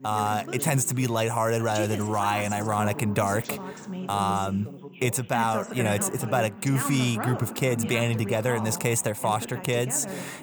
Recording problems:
background chatter; loud; throughout; 2 voices, 10 dB below the speech

